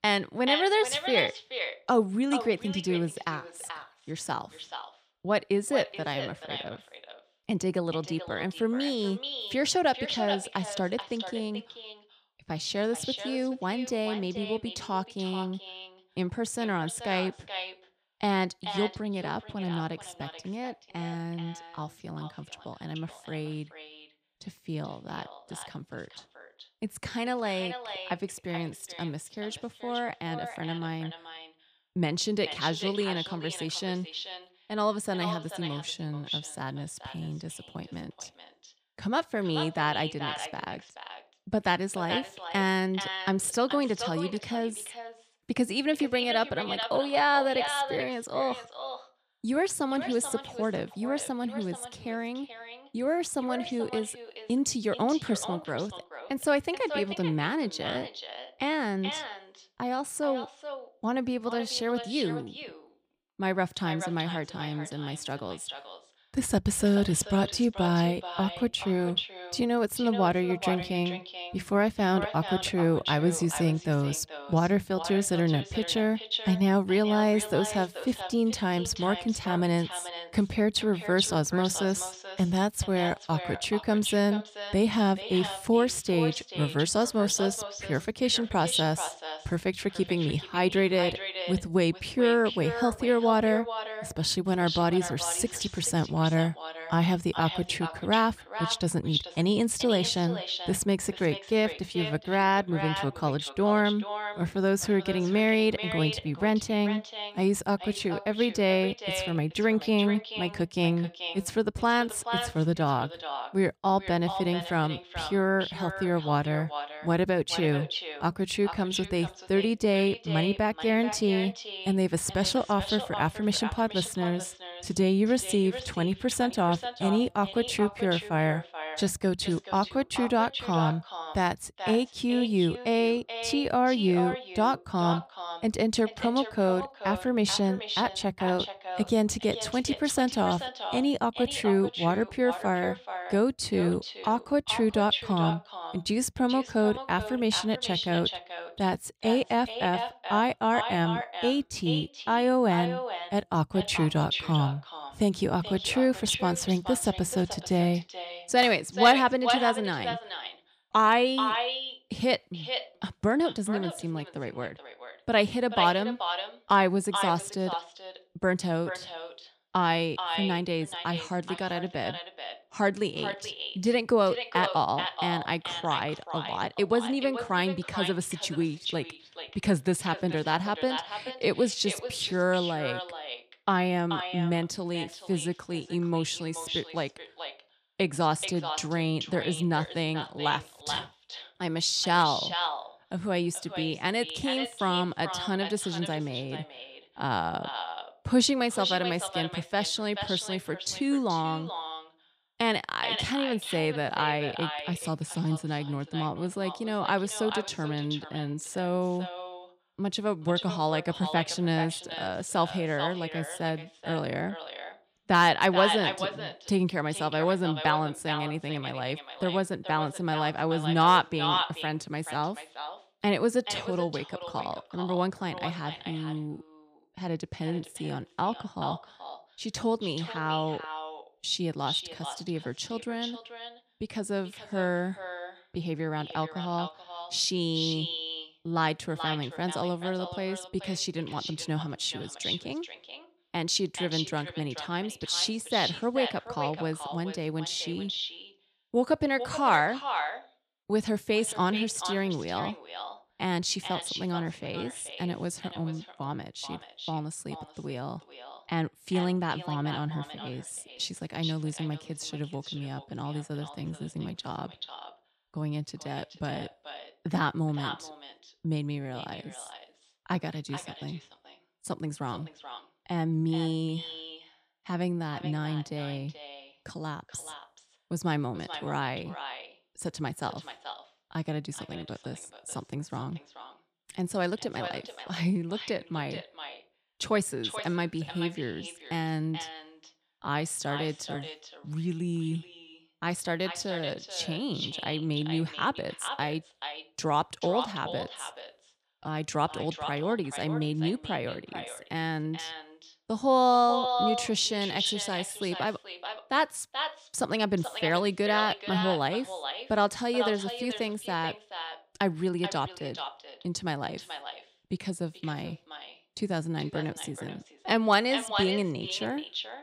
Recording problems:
echo of what is said; strong; throughout; 430 ms later, 8 dB below the speech

